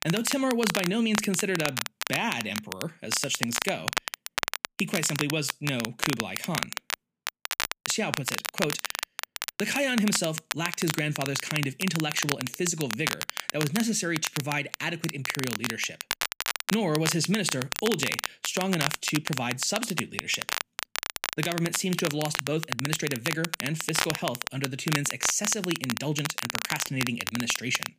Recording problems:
crackle, like an old record; loud; 3 dB below the speech

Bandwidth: 15 kHz